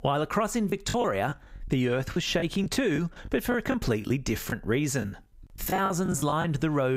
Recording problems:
squashed, flat; somewhat
choppy; very; 11% of the speech affected
abrupt cut into speech; at the end

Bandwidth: 15.5 kHz